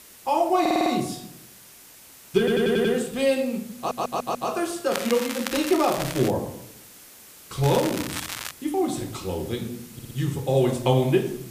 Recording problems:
room echo; slight; dies away in 0.5 s
off-mic speech; somewhat distant
crackling; loud; from 5 to 6.5 s and at 7.5 s; 8 dB below the speech
hiss; faint; throughout; 20 dB below the speech
audio stuttering; 4 times, first at 0.5 s

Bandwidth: 15 kHz